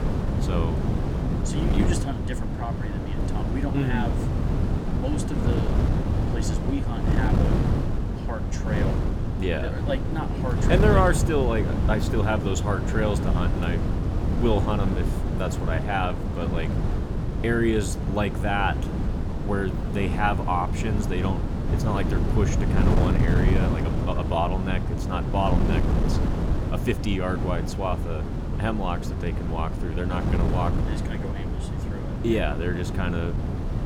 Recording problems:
wind noise on the microphone; heavy; 4 dB below the speech

